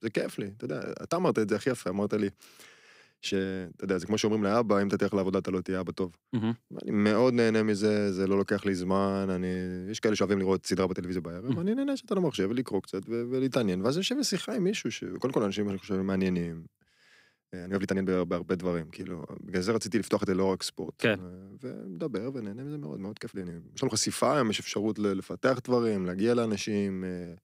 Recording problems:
uneven, jittery; strongly; from 0.5 to 26 s

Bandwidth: 15.5 kHz